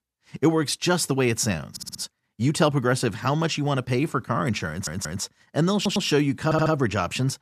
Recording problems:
audio stuttering; 4 times, first at 1.5 s

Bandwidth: 14.5 kHz